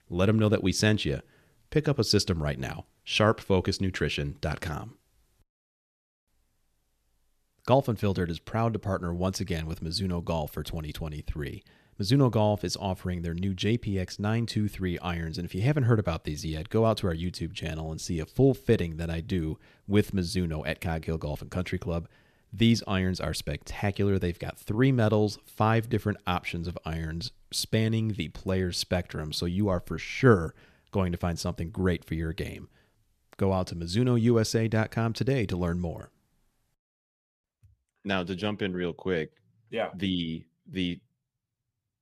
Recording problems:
none

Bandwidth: 14 kHz